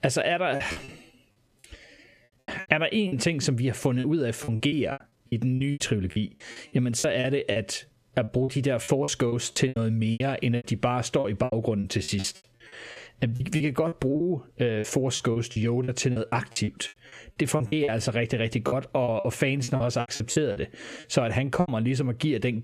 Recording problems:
squashed, flat; somewhat
choppy; very; 15% of the speech affected

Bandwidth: 14.5 kHz